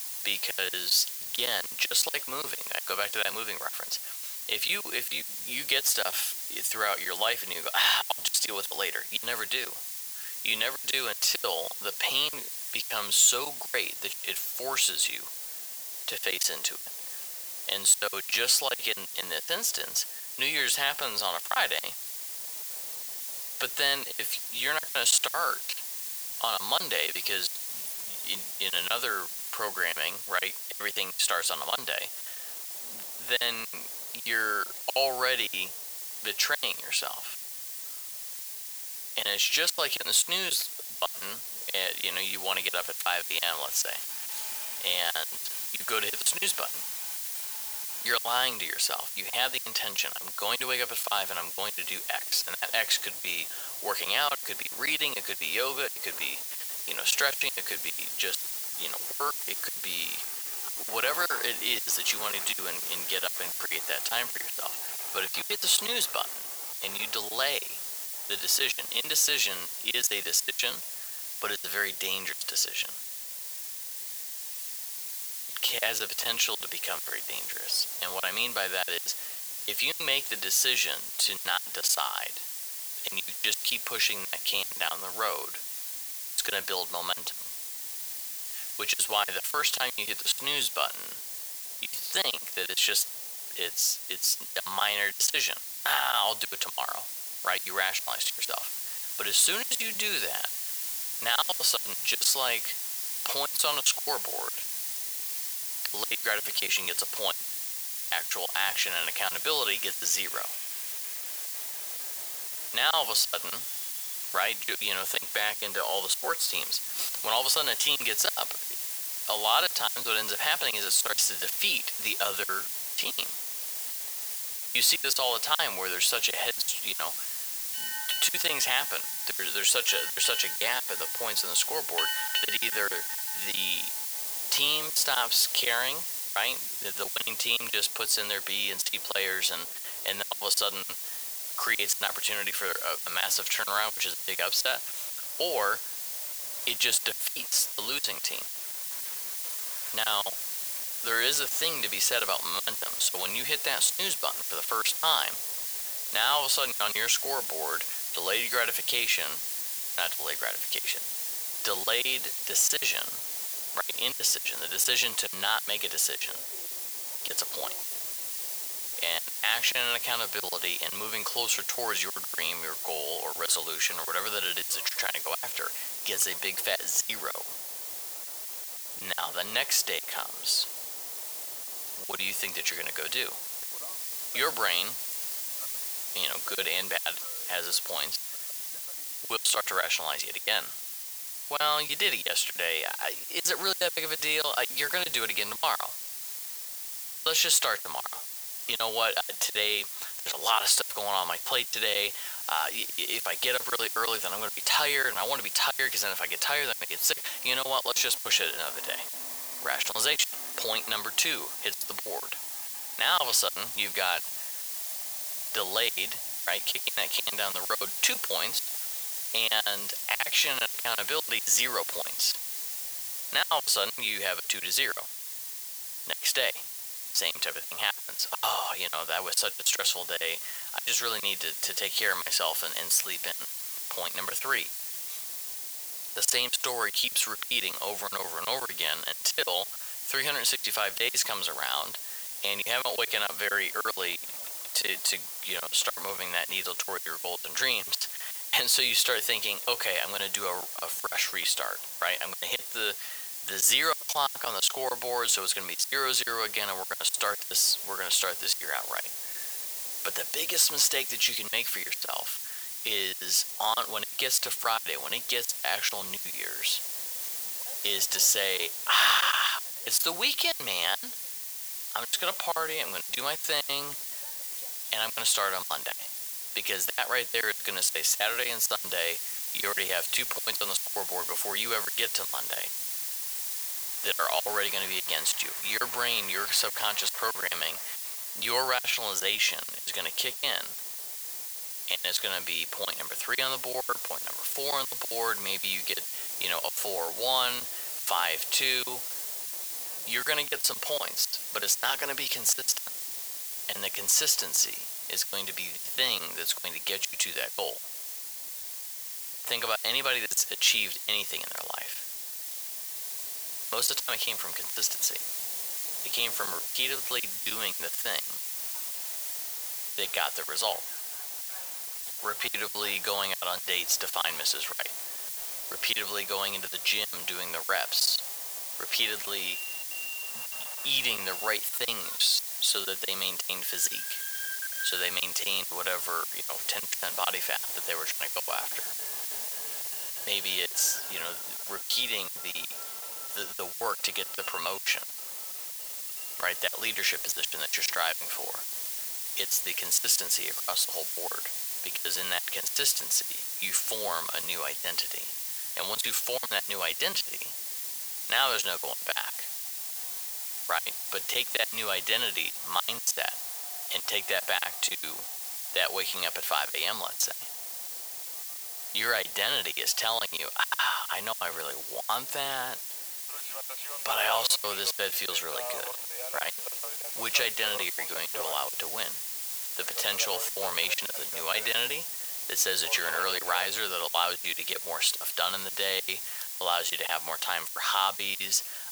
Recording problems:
thin; very; fading below 700 Hz
hiss; loud; throughout; 5 dB below the speech
train or aircraft noise; noticeable; throughout; 20 dB below the speech
choppy; very; 15% of the speech affected

